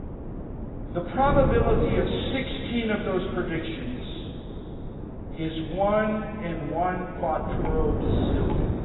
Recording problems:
garbled, watery; badly; nothing above 4 kHz
room echo; noticeable; dies away in 2.2 s
off-mic speech; somewhat distant
wind noise on the microphone; heavy; 10 dB below the speech
rain or running water; very faint; throughout; 15 dB below the speech

